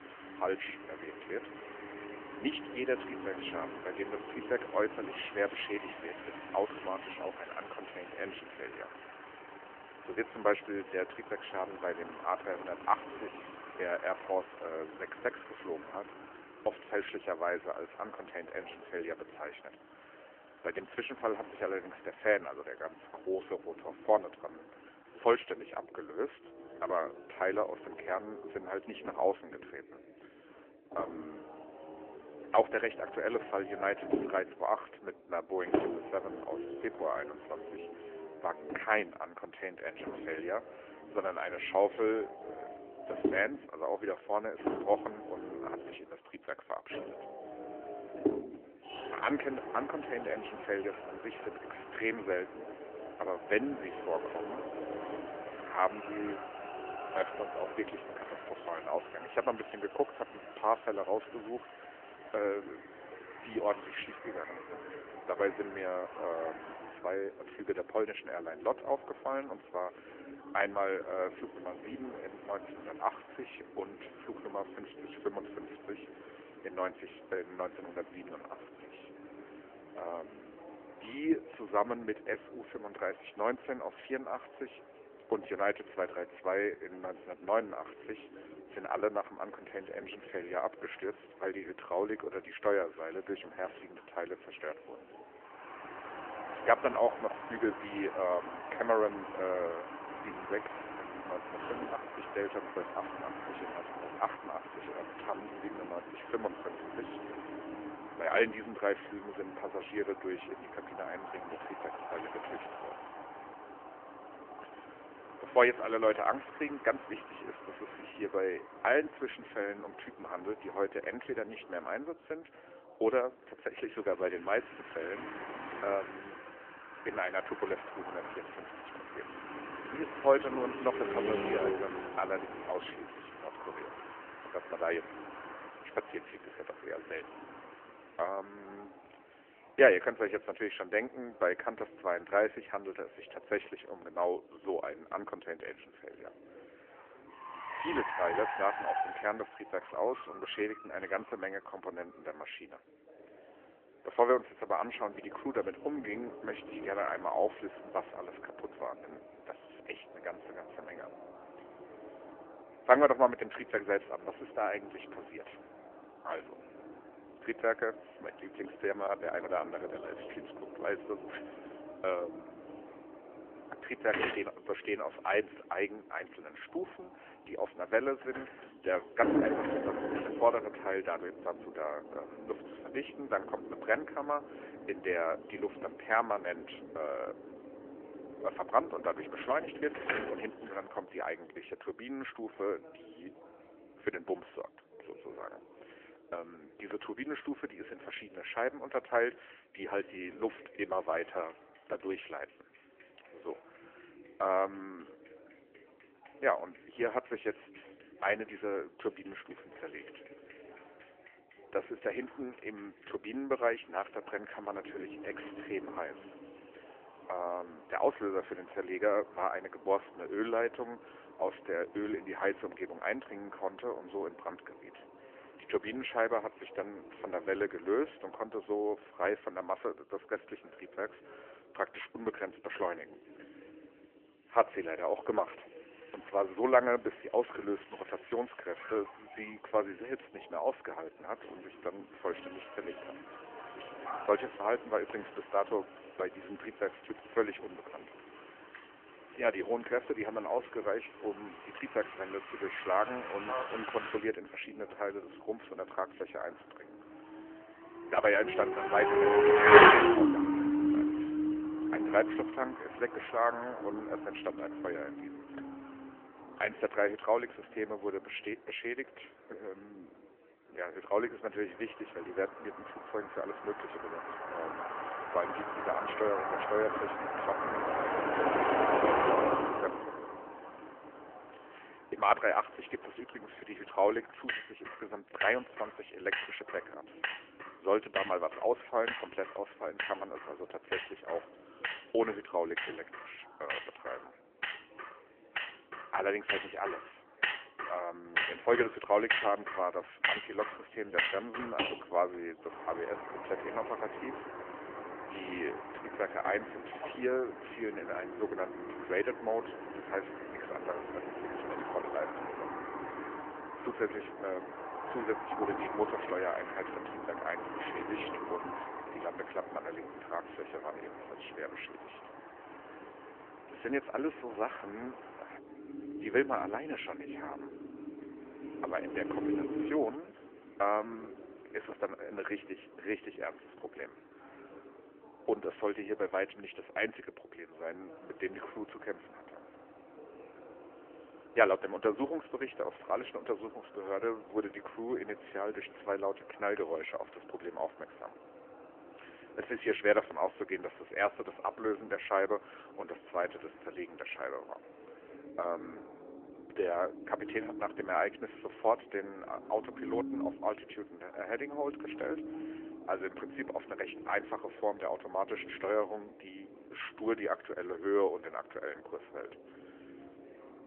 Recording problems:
phone-call audio; nothing above 3 kHz
traffic noise; loud; throughout; 1 dB below the speech
background chatter; faint; throughout; 4 voices, 20 dB below the speech

